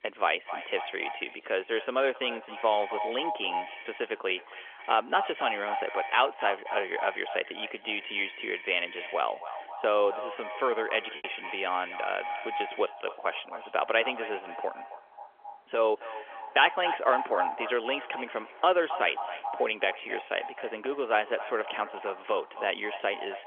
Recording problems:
echo of what is said; strong; throughout; 270 ms later, 9 dB below the speech
phone-call audio; nothing above 3.5 kHz
traffic noise; noticeable; throughout; 15 dB below the speech
choppy; occasionally; at 11 s; 3% of the speech affected

